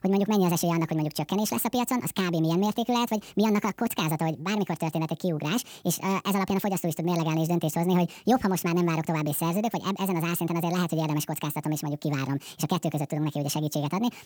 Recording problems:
wrong speed and pitch; too fast and too high; 1.7 times normal speed

